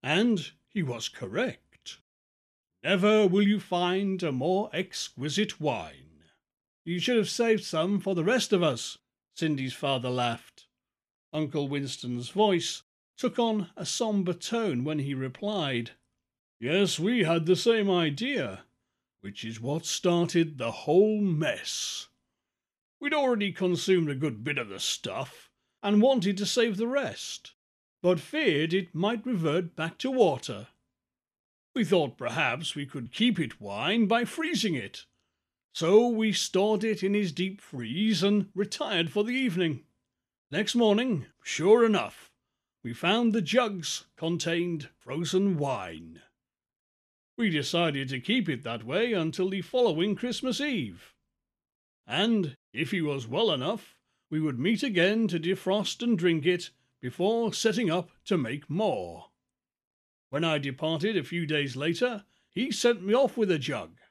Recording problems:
none

